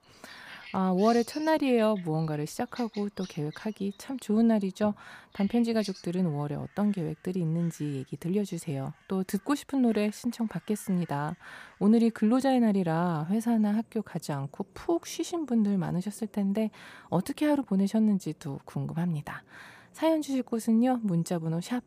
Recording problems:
animal sounds; faint; throughout; 25 dB below the speech

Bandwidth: 15 kHz